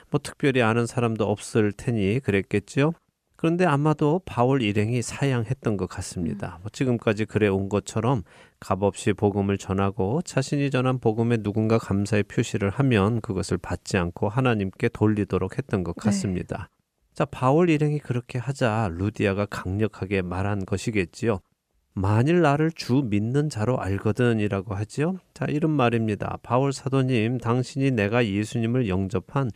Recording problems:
none

